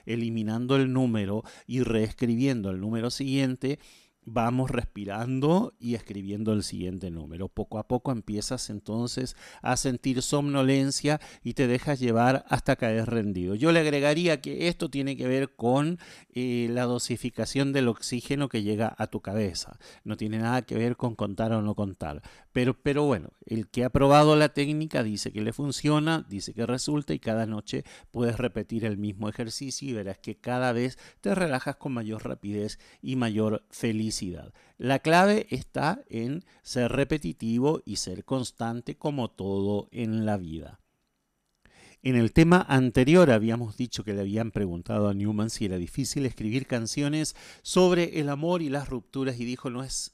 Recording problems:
none

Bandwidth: 14.5 kHz